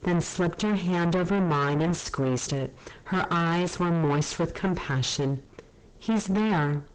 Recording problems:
distortion; heavy; 5 dB below the speech
garbled, watery; slightly; nothing above 8 kHz

